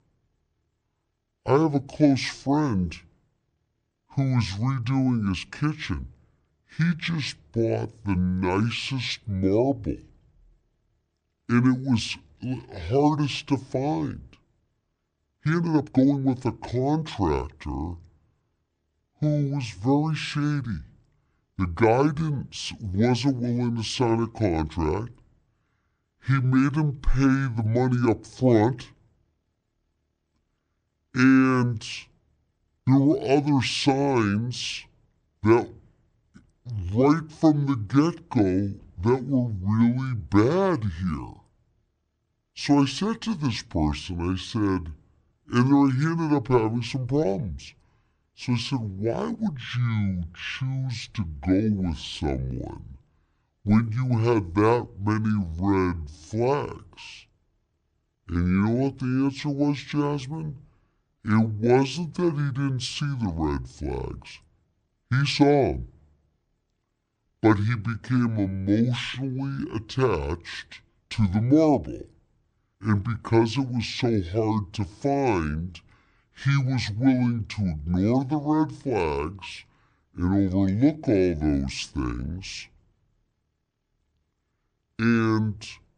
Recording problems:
wrong speed and pitch; too slow and too low; 0.6 times normal speed
uneven, jittery; strongly; from 15 s to 1:02

